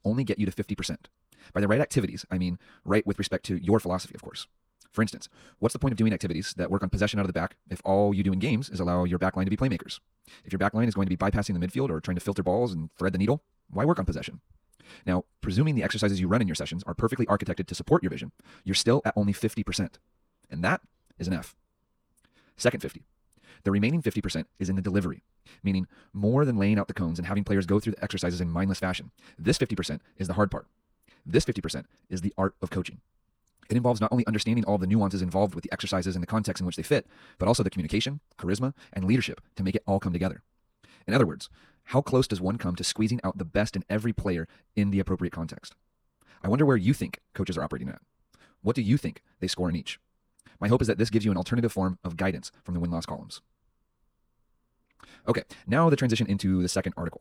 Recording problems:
wrong speed, natural pitch; too fast; 1.5 times normal speed

